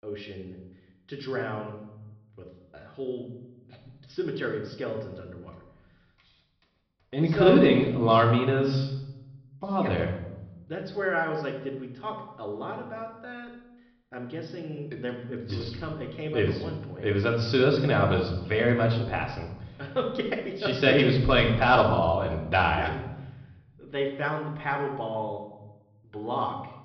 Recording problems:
high frequencies cut off; noticeable; nothing above 5.5 kHz
room echo; slight; dies away in 0.8 s
off-mic speech; somewhat distant

